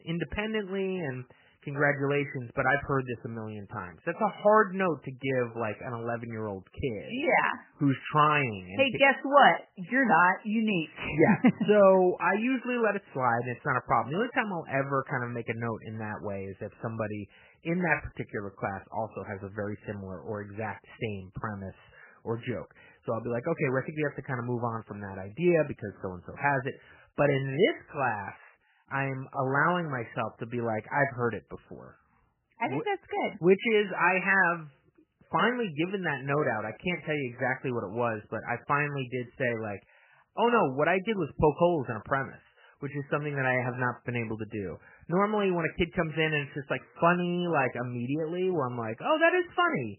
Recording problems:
garbled, watery; badly; nothing above 3 kHz

